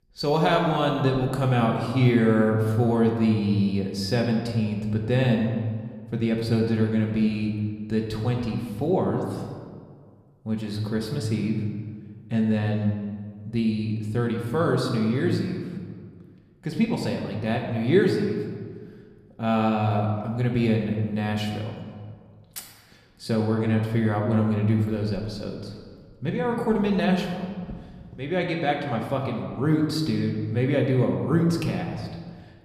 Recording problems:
room echo; slight; dies away in 1.4 s
off-mic speech; somewhat distant

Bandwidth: 14.5 kHz